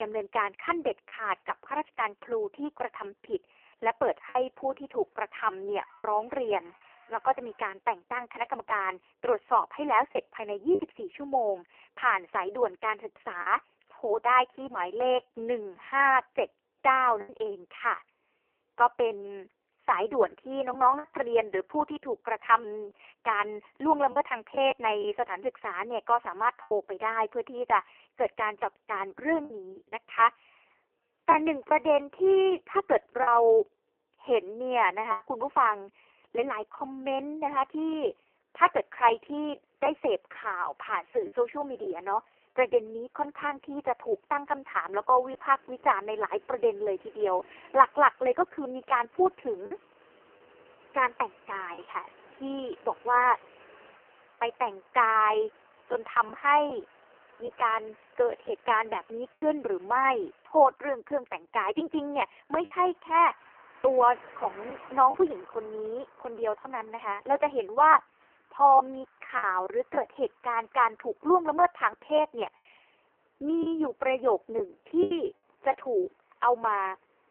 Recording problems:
phone-call audio; poor line; nothing above 3 kHz
traffic noise; faint; throughout; 30 dB below the speech
choppy; occasionally; 3% of the speech affected
abrupt cut into speech; at the start

